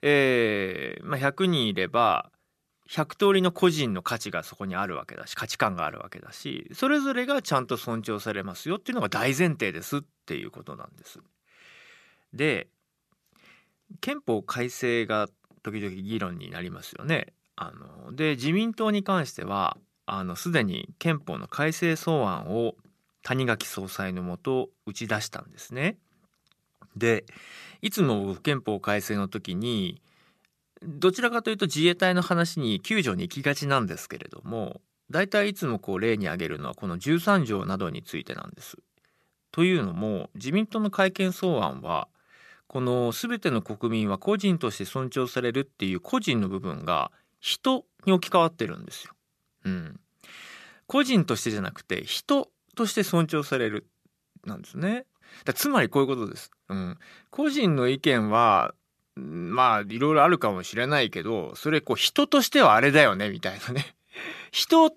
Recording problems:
none

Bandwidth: 14 kHz